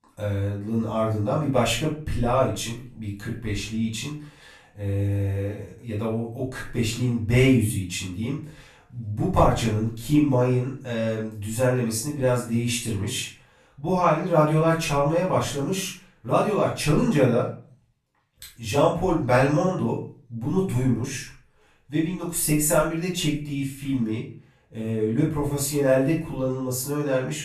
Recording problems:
off-mic speech; far
room echo; noticeable; dies away in 0.4 s

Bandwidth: 14 kHz